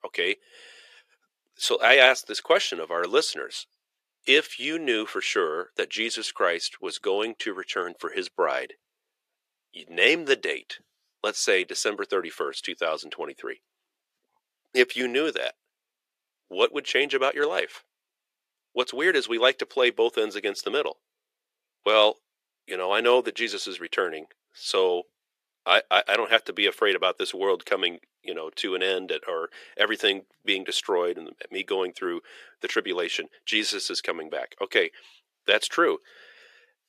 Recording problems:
thin; somewhat; fading below 400 Hz

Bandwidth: 14.5 kHz